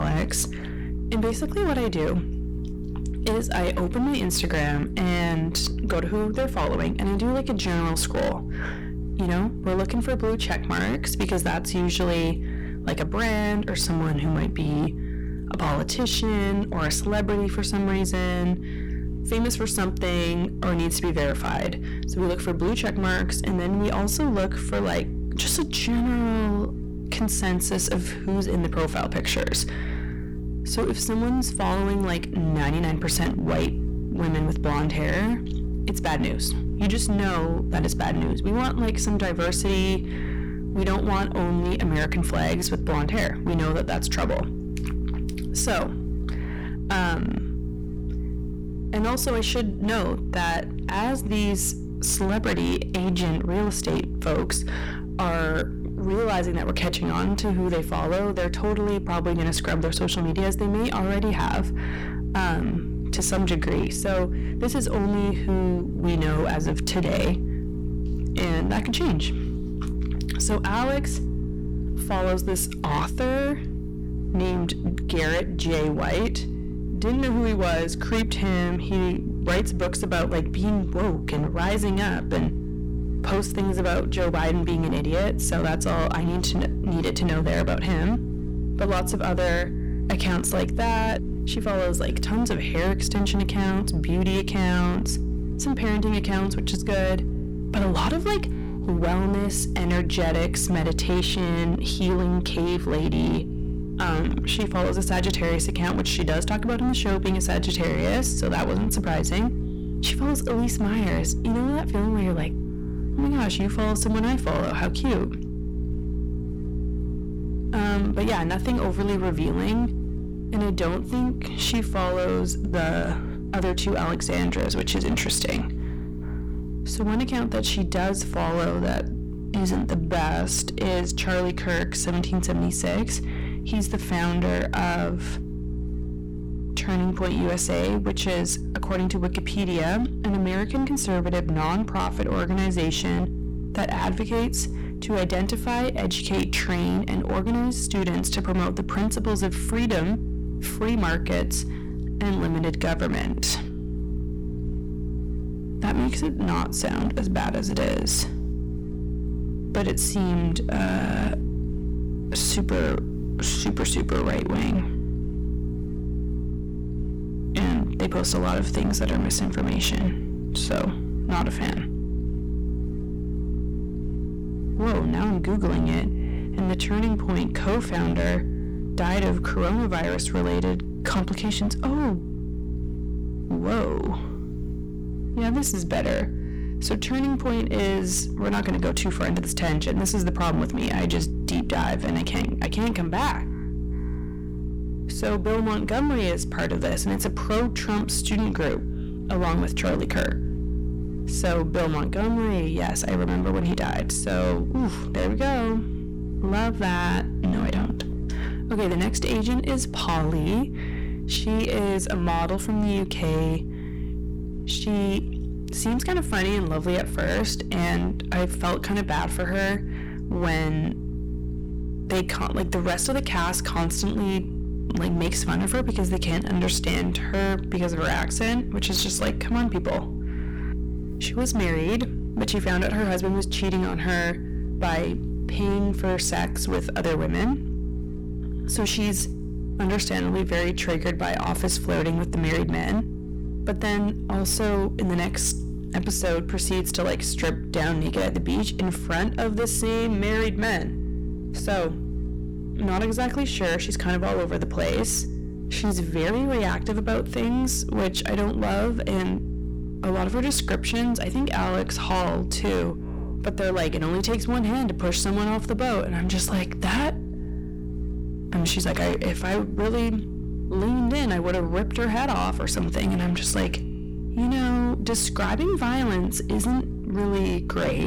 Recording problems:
distortion; heavy; 18% of the sound clipped
electrical hum; noticeable; throughout; 60 Hz, 10 dB below the speech
abrupt cut into speech; at the start and the end

